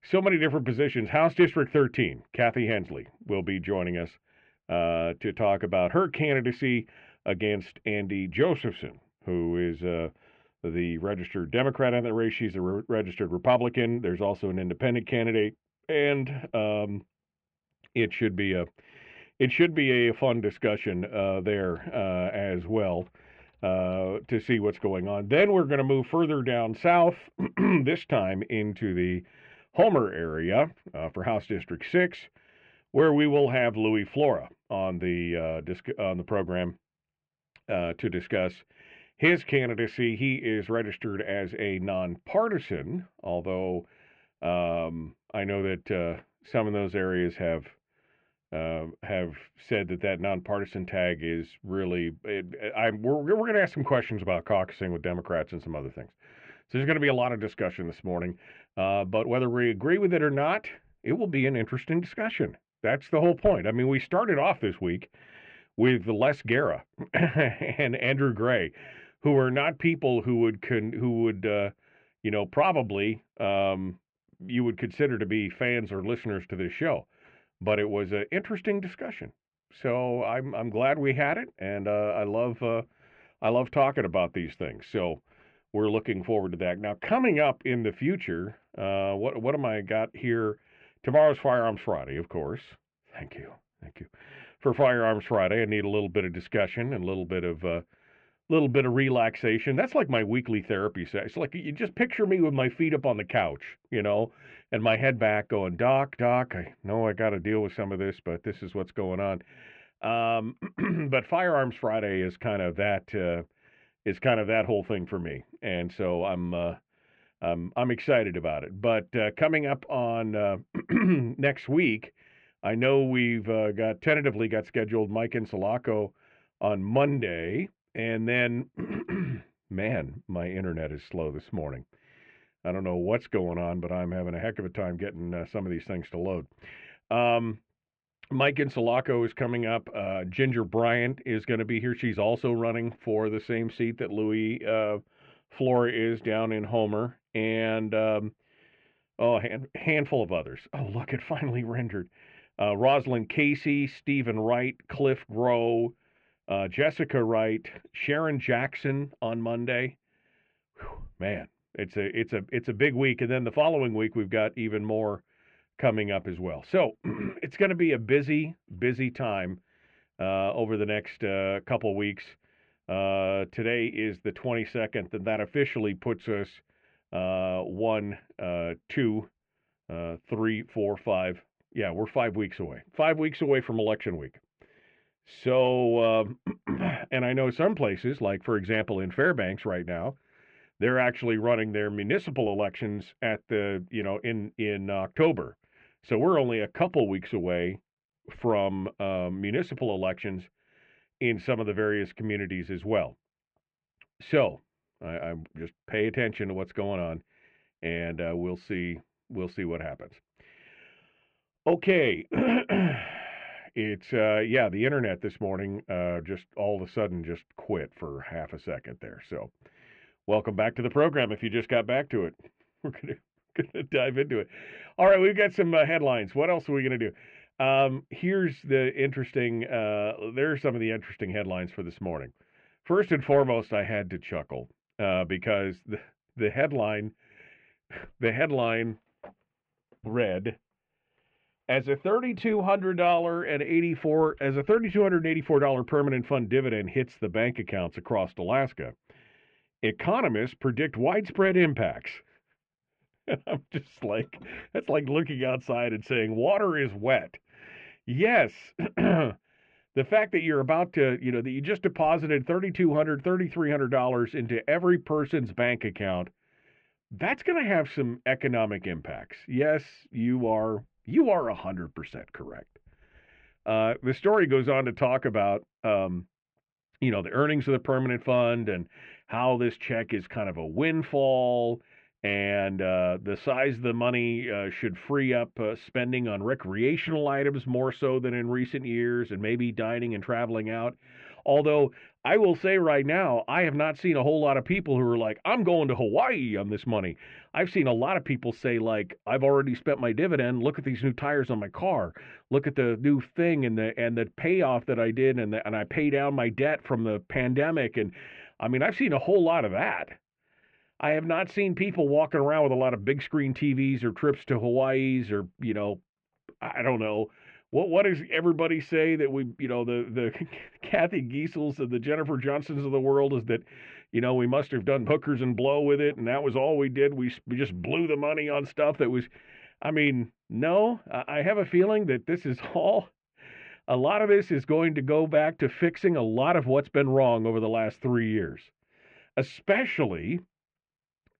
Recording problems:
muffled; very; fading above 2.5 kHz

